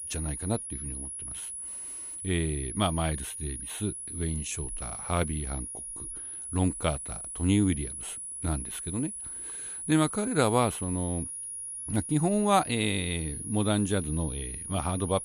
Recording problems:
high-pitched whine; loud; throughout; 10.5 kHz, 6 dB below the speech

